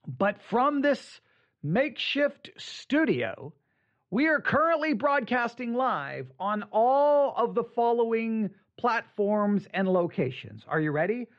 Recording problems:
muffled; very; fading above 3.5 kHz

